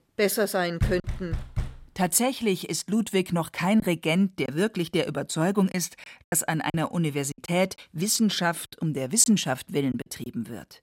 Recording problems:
choppy; occasionally; 5% of the speech affected
door banging; noticeable; at 1 s; peak 4 dB below the speech

